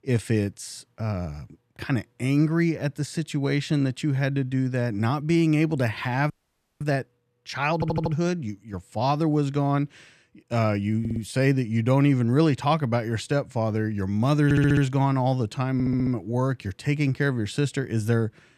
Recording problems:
audio freezing; at 6.5 s for 0.5 s
audio stuttering; 4 times, first at 7.5 s

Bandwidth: 14 kHz